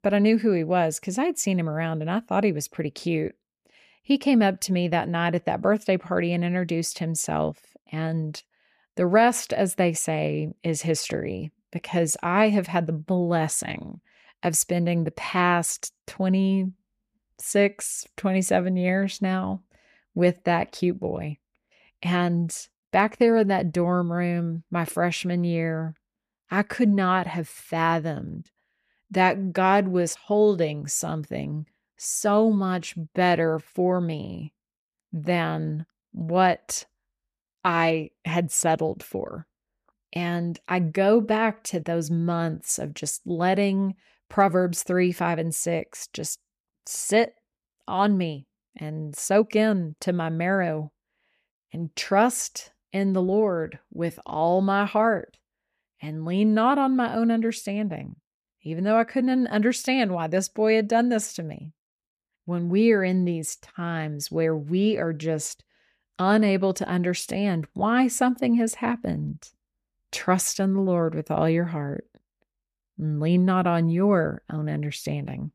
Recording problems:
none

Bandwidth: 14.5 kHz